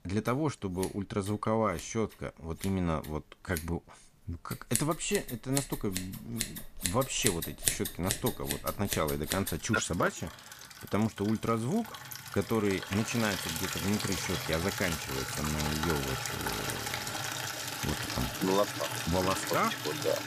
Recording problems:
household noises; loud; throughout; 2 dB below the speech

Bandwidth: 15 kHz